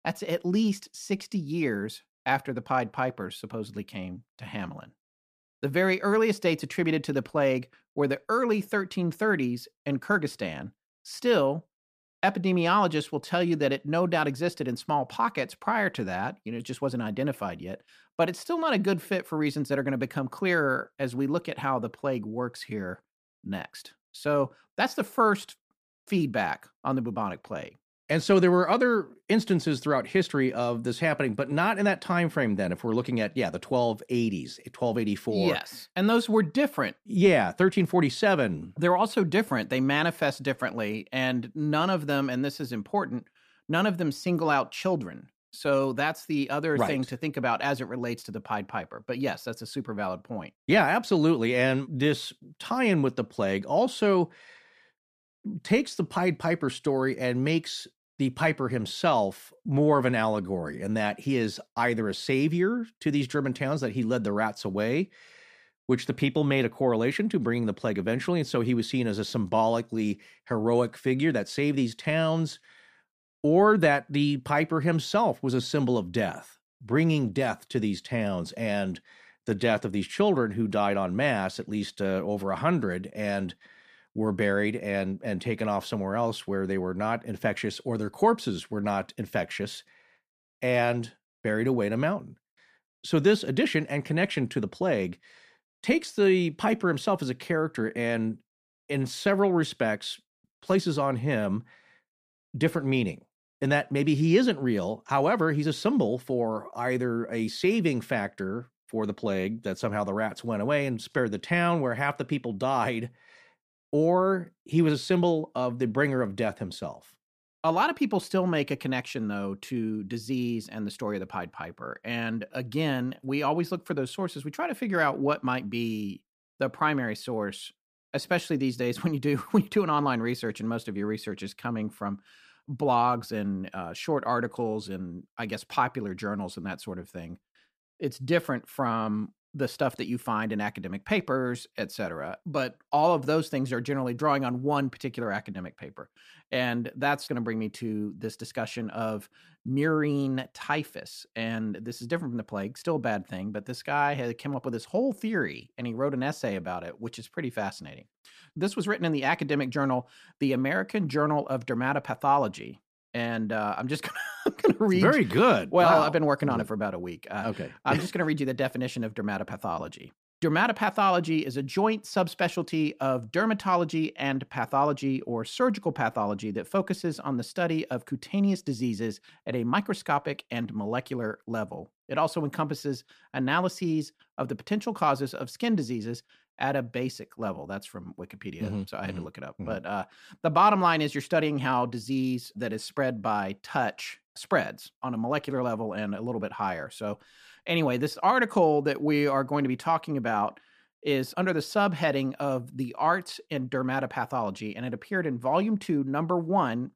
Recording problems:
none

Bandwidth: 15 kHz